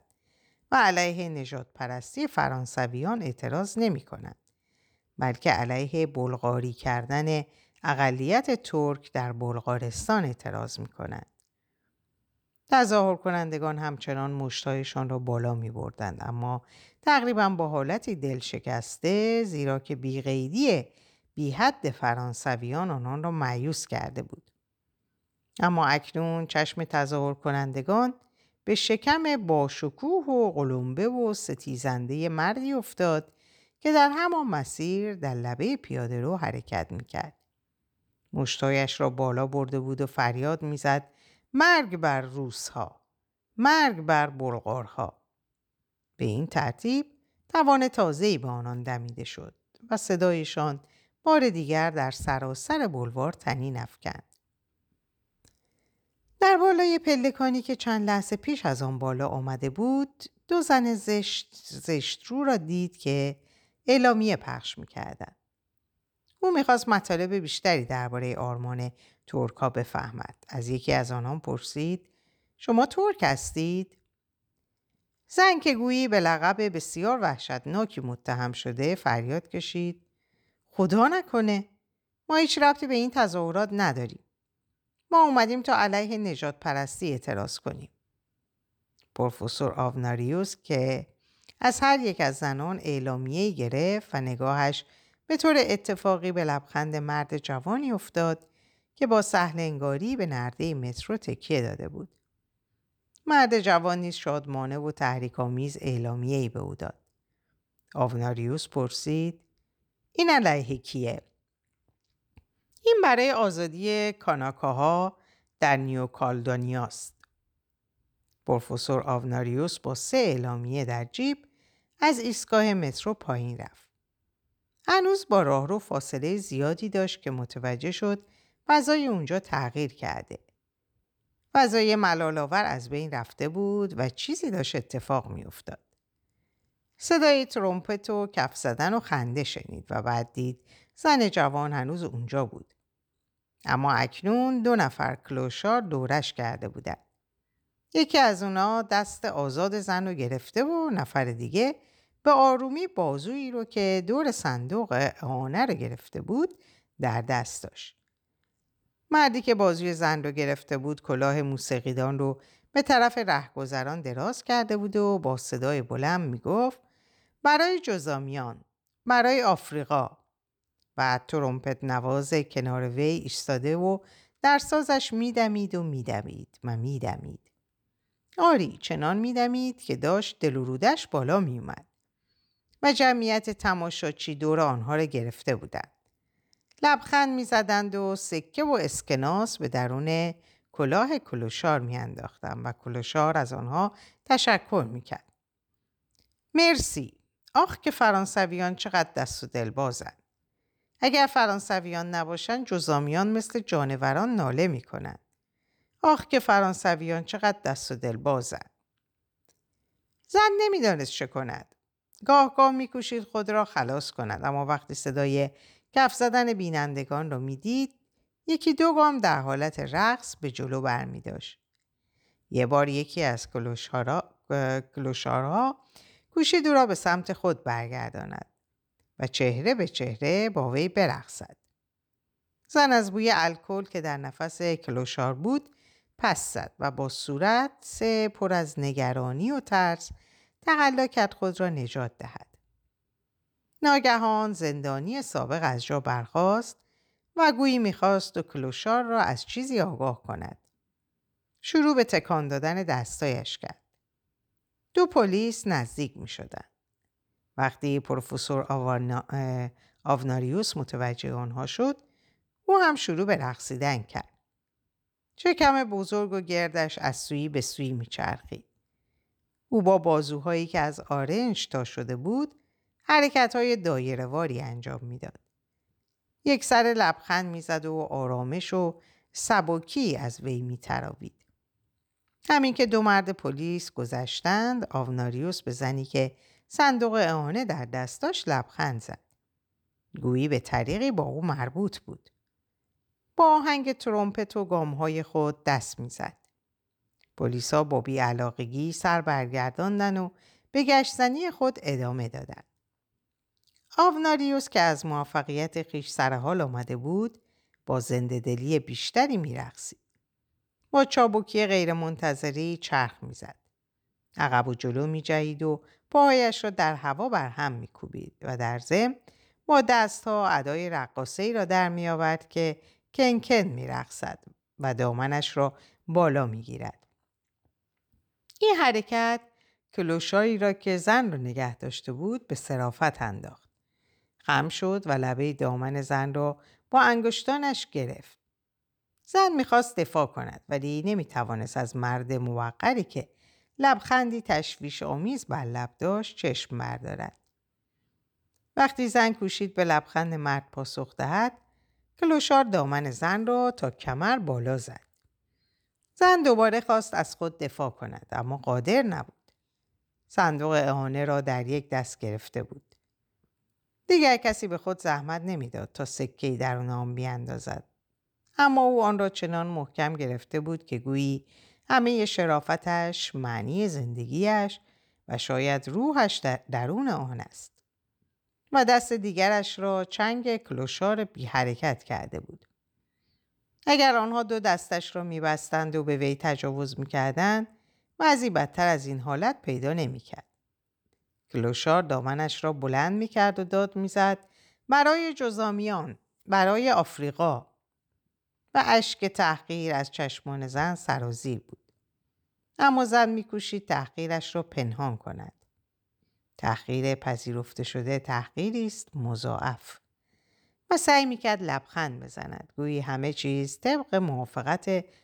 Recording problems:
none

